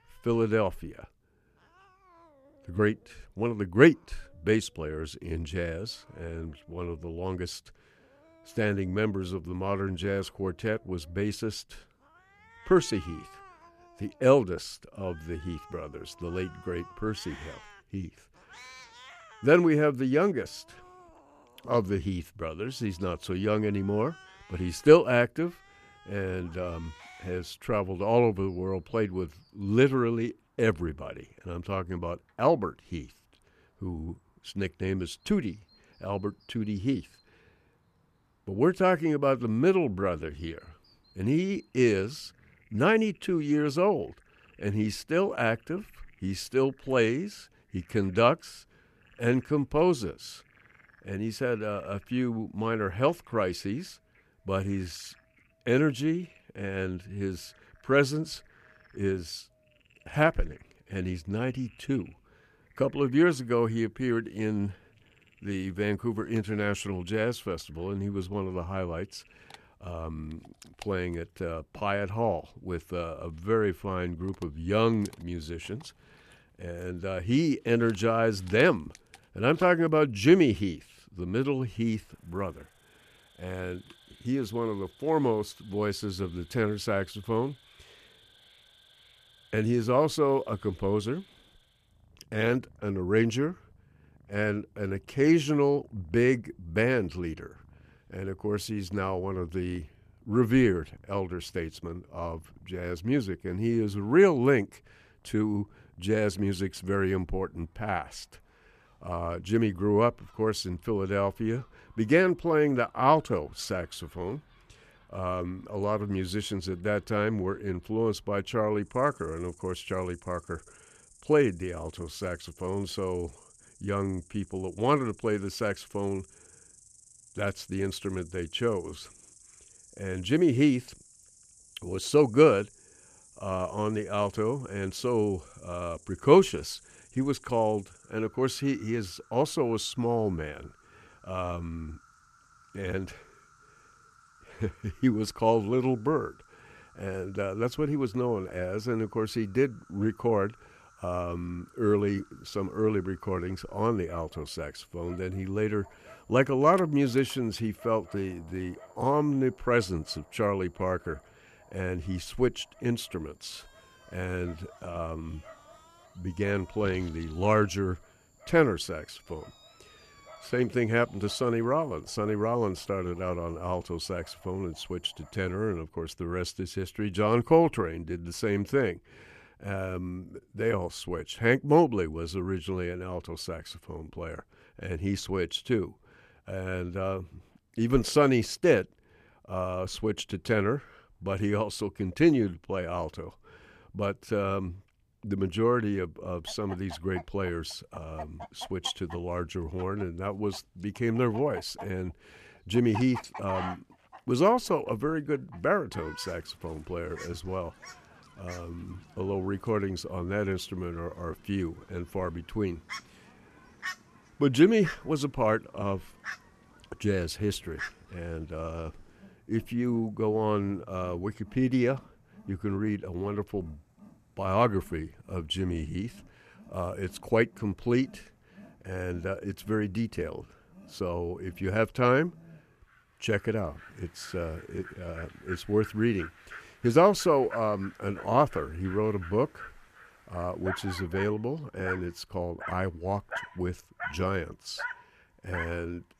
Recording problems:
animal sounds; faint; throughout; 20 dB below the speech

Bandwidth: 14.5 kHz